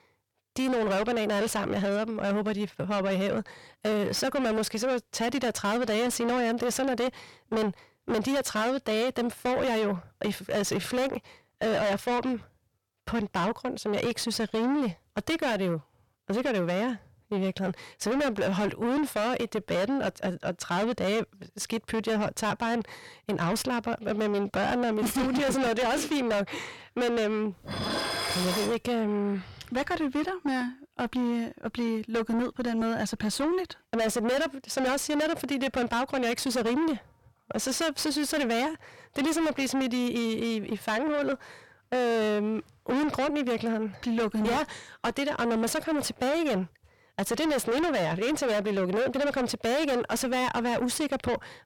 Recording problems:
distortion; heavy; 6 dB below the speech
clattering dishes; loud; from 28 to 29 s; peak 1 dB above the speech

